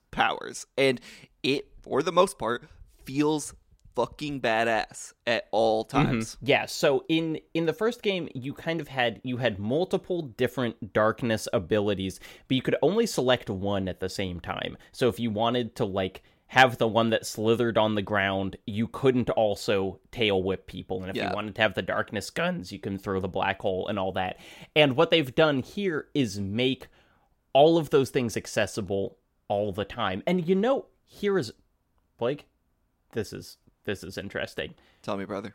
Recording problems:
none

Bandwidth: 16 kHz